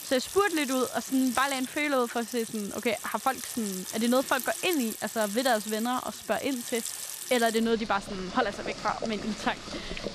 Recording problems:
household noises; loud; throughout; 8 dB below the speech

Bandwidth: 14.5 kHz